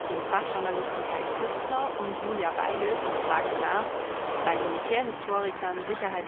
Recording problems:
phone-call audio; poor line; nothing above 3.5 kHz
traffic noise; loud; throughout; as loud as the speech

